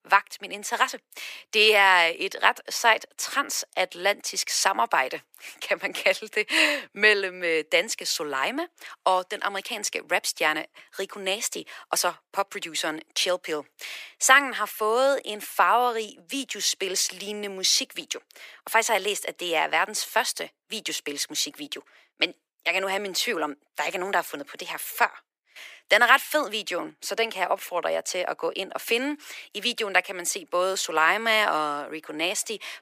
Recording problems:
thin; very; fading below 450 Hz

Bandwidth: 15 kHz